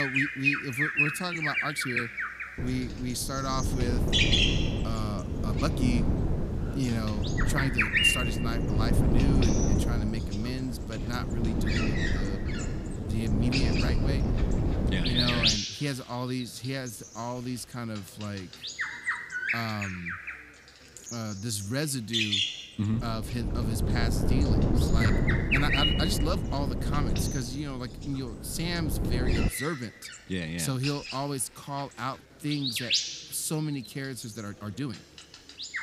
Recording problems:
animal sounds; very loud; throughout; 4 dB above the speech
wind noise on the microphone; heavy; from 2.5 to 16 s and from 23 to 29 s; 2 dB below the speech
chatter from many people; faint; throughout; 25 dB below the speech
abrupt cut into speech; at the start
uneven, jittery; strongly; from 1 to 35 s

